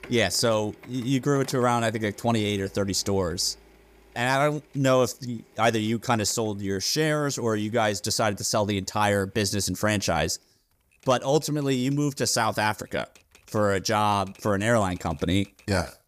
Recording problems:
household noises; faint; throughout; 30 dB below the speech

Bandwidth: 15 kHz